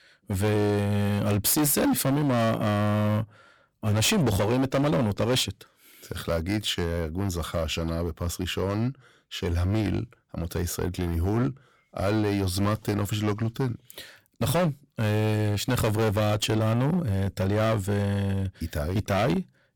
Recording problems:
distortion; heavy; 15% of the sound clipped

